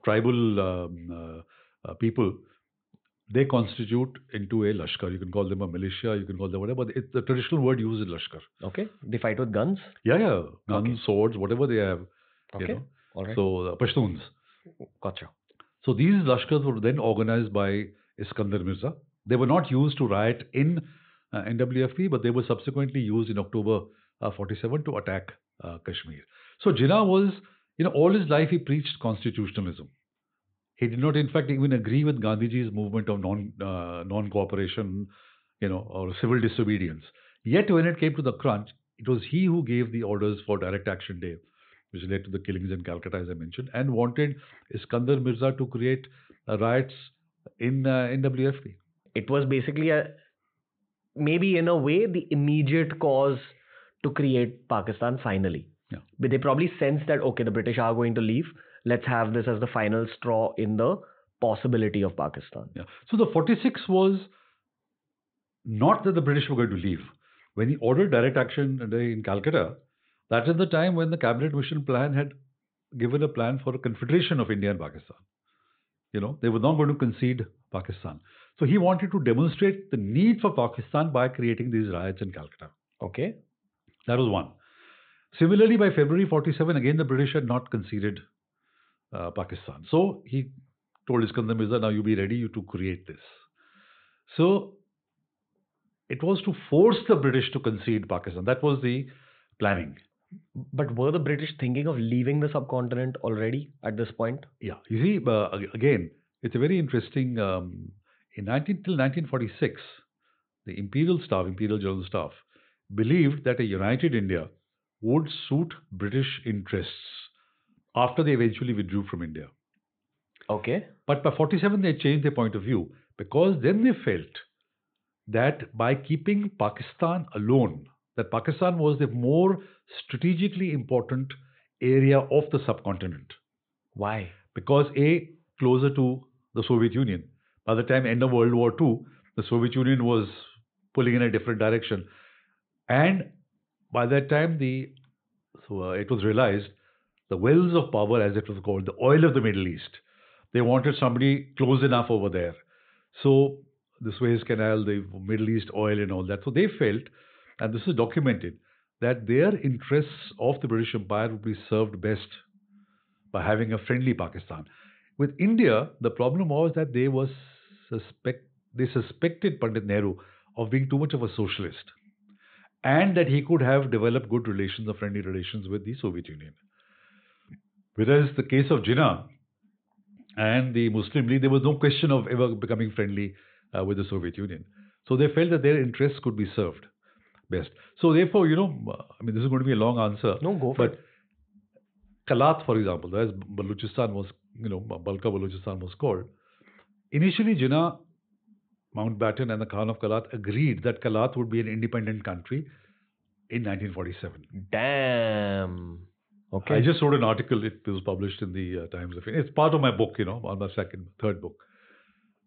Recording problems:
high frequencies cut off; severe; nothing above 4 kHz

